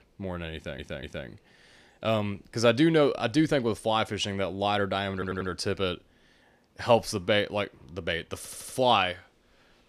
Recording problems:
audio stuttering; at 0.5 s, at 5 s and at 8.5 s

